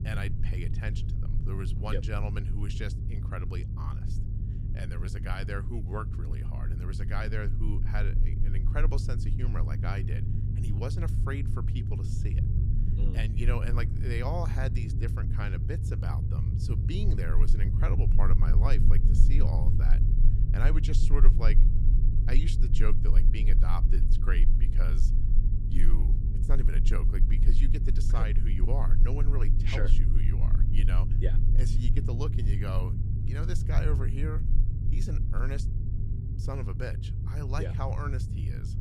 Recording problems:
low rumble; loud; throughout; 4 dB below the speech

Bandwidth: 14.5 kHz